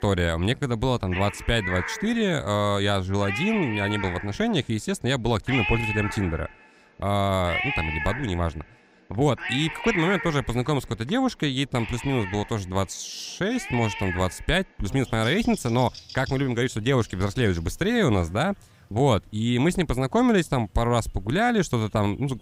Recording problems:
animal sounds; loud; throughout; 7 dB below the speech

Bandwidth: 15.5 kHz